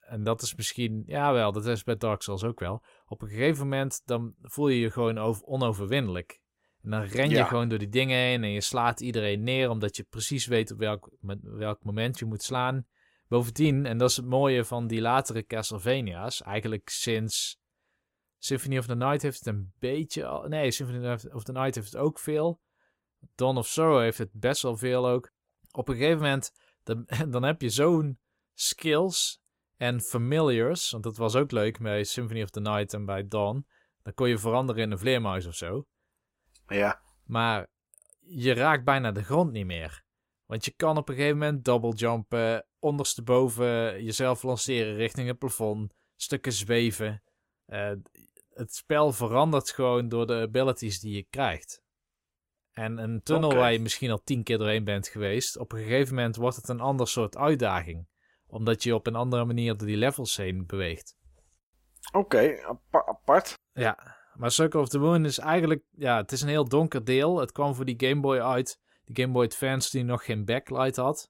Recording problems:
none

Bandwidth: 16 kHz